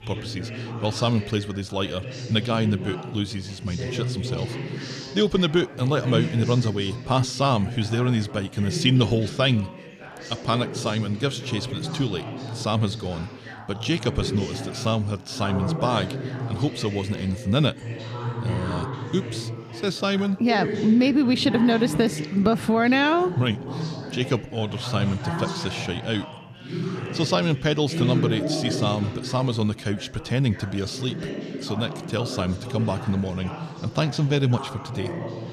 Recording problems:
background chatter; loud; throughout; 4 voices, 8 dB below the speech

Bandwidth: 14.5 kHz